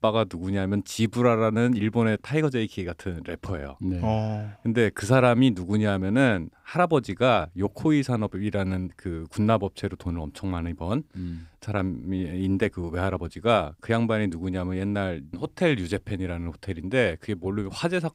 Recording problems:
none

